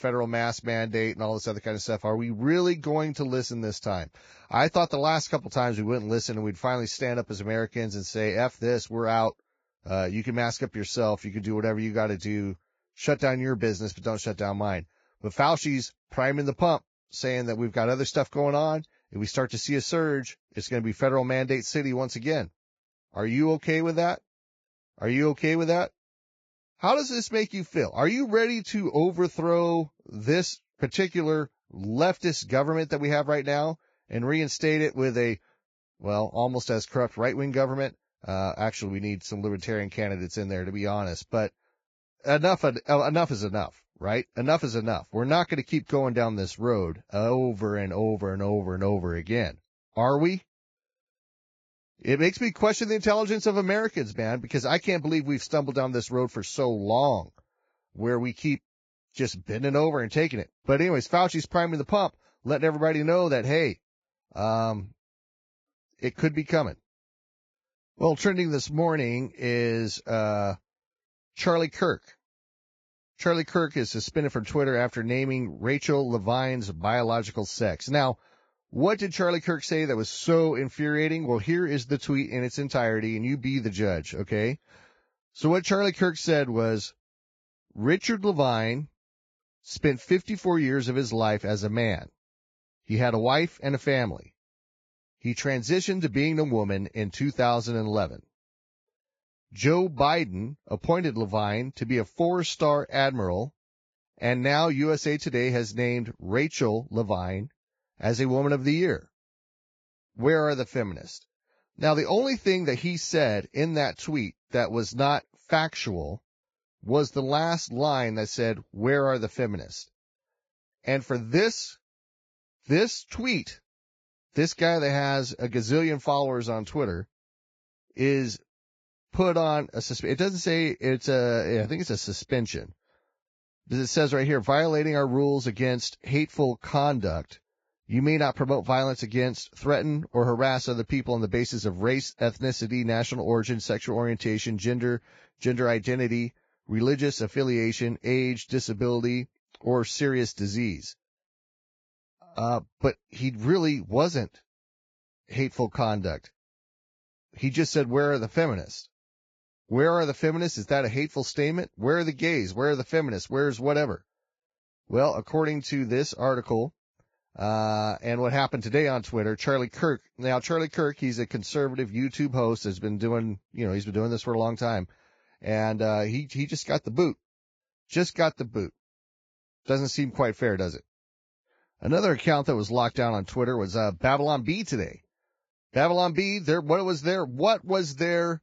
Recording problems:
garbled, watery; badly; nothing above 7.5 kHz

